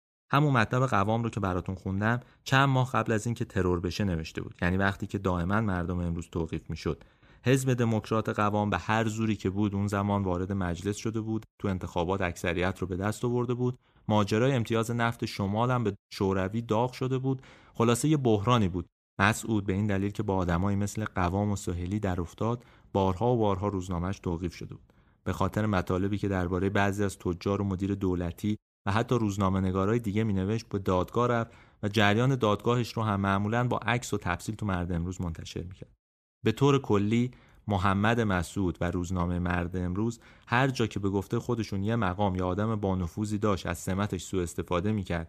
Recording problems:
none

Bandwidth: 14.5 kHz